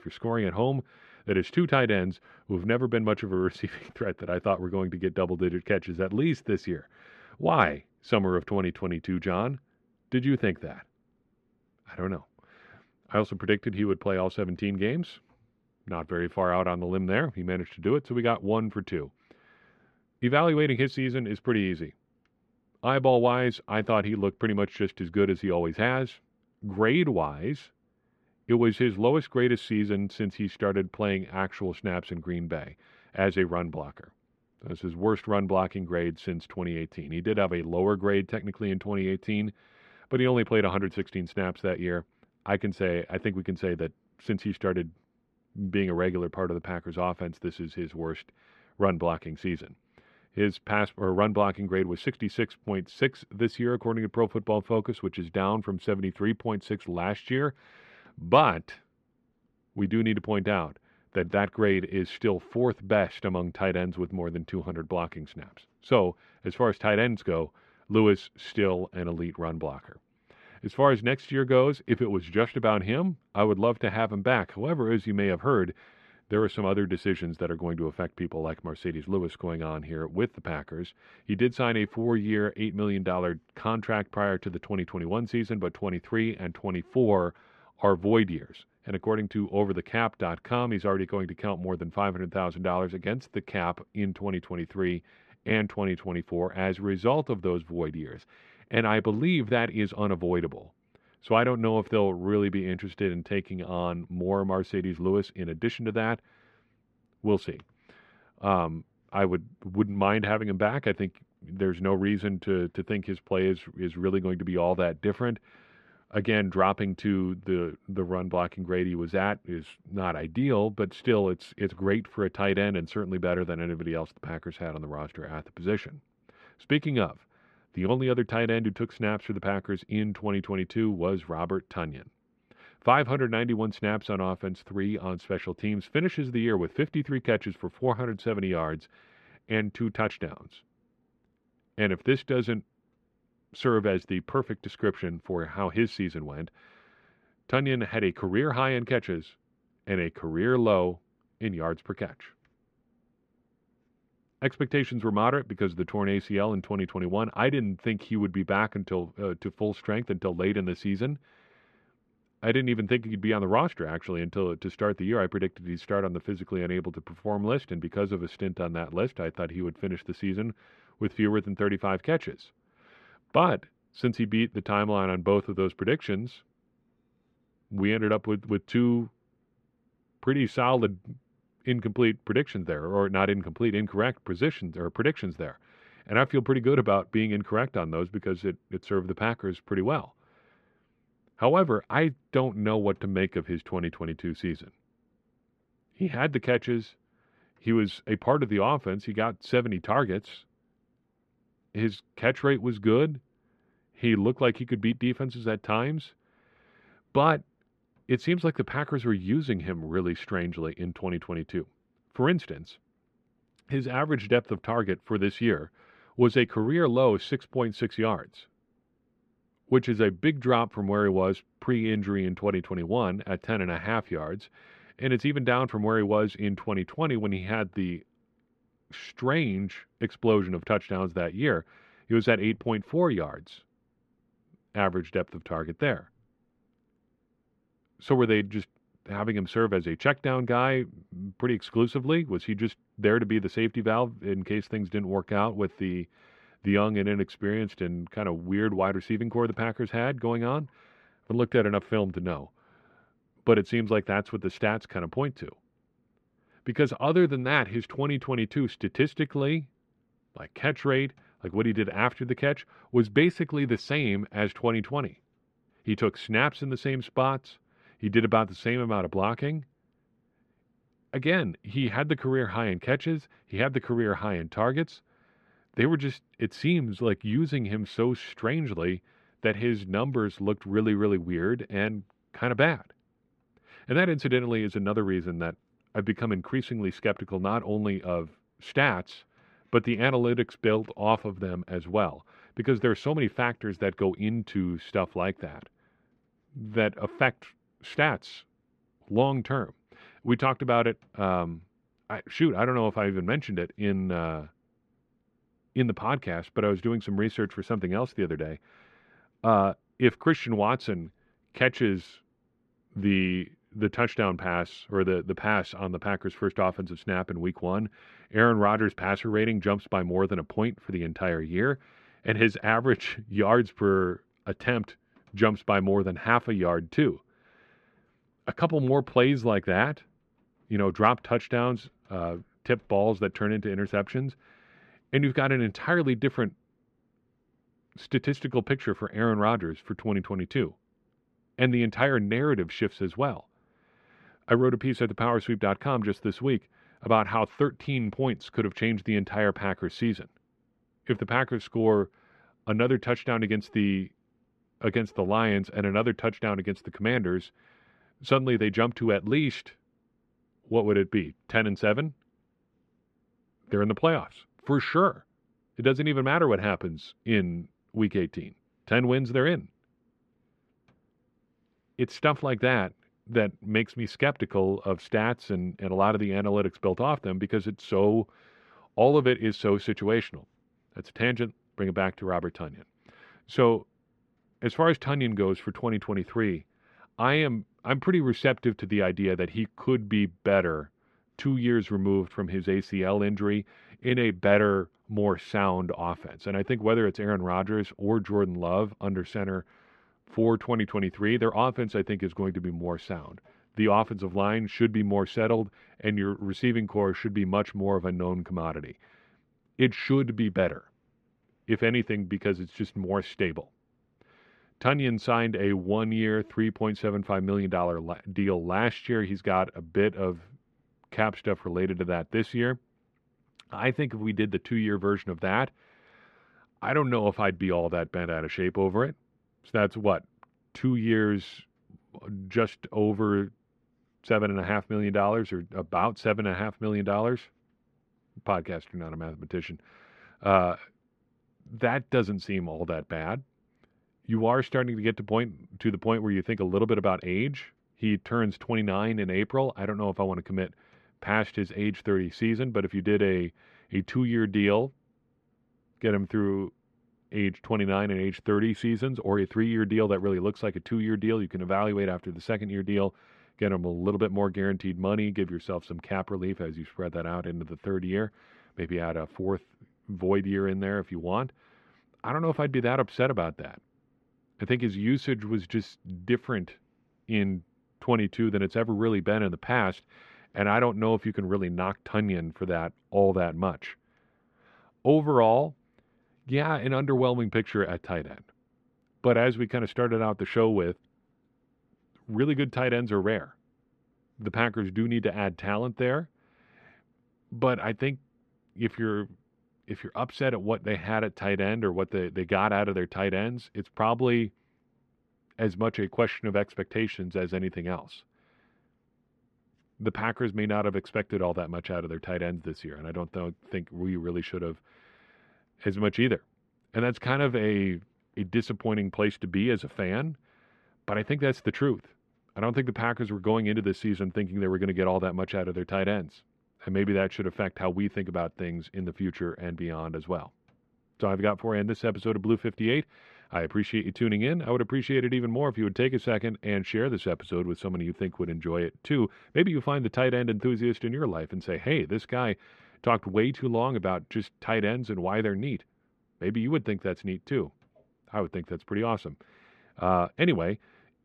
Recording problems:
muffled; slightly; fading above 2 kHz

